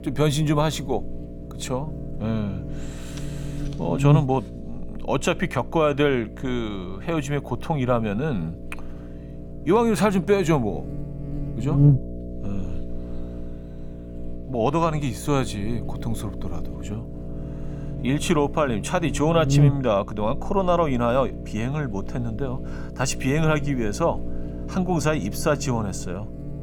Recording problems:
electrical hum; noticeable; throughout; 60 Hz, 15 dB below the speech

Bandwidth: 17.5 kHz